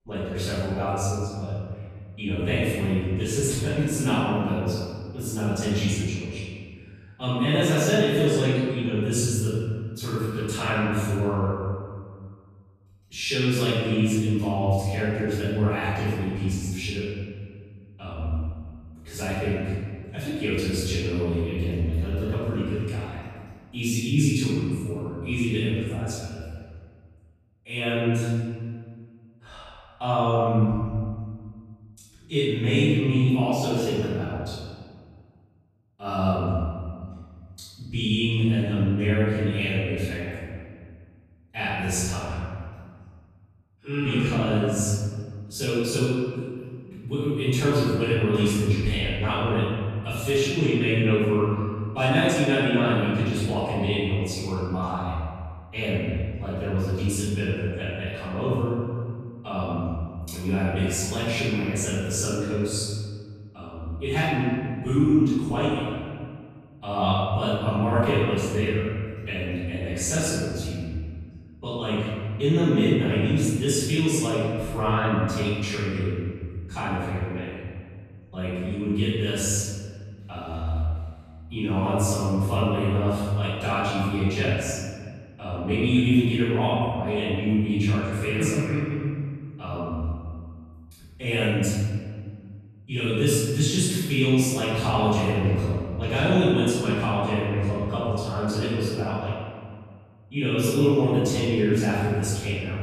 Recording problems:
room echo; strong; dies away in 1.8 s
off-mic speech; far

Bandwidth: 14.5 kHz